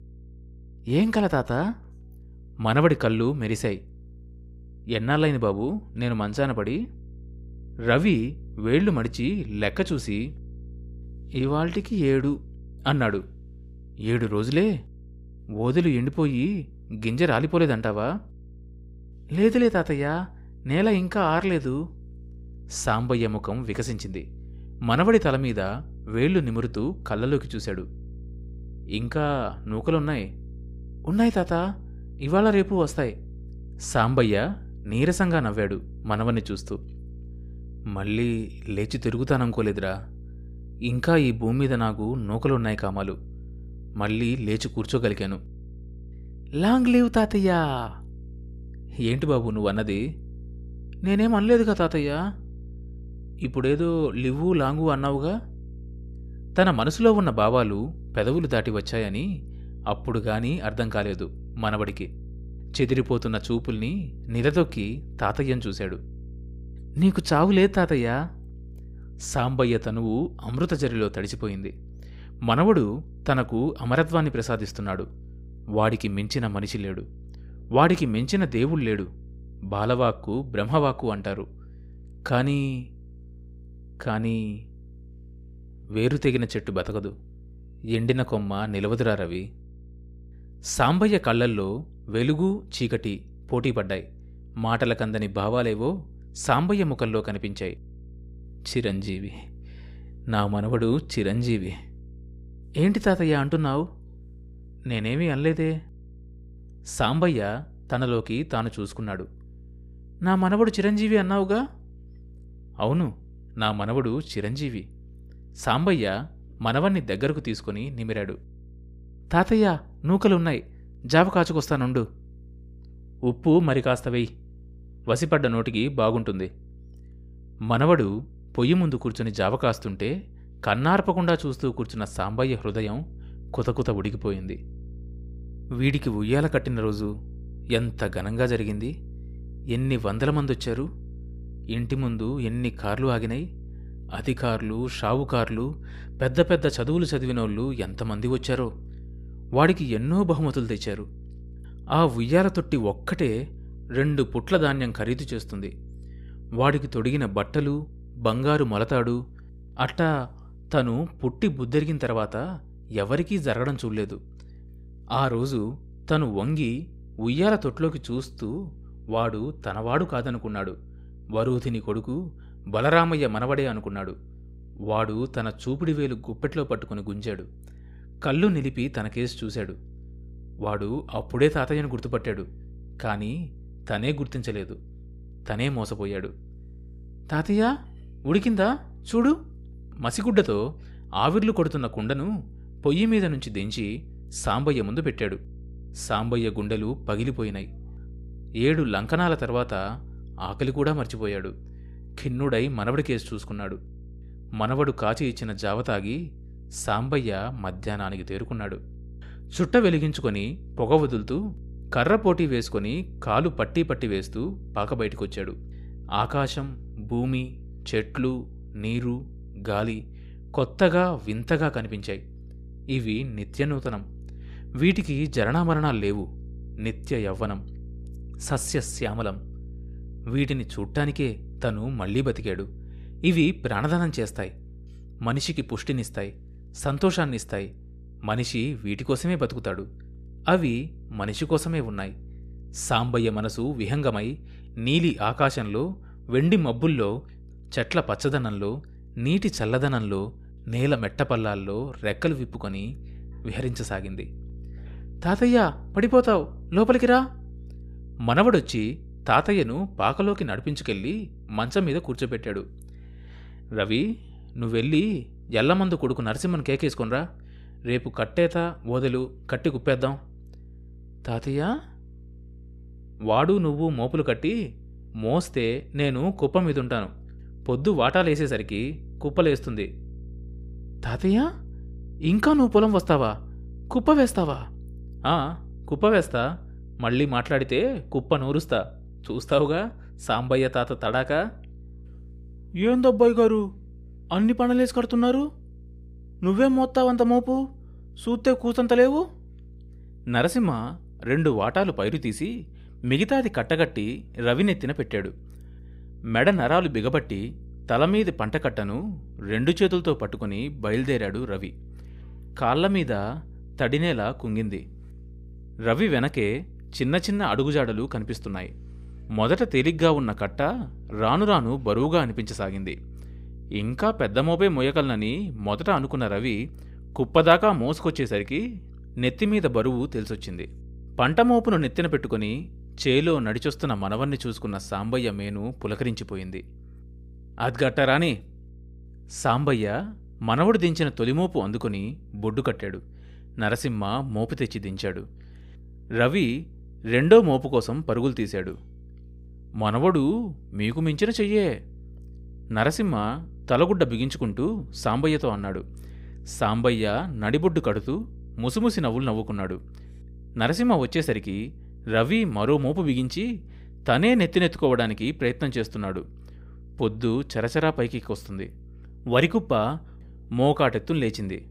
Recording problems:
electrical hum; faint; throughout; 60 Hz, 30 dB below the speech

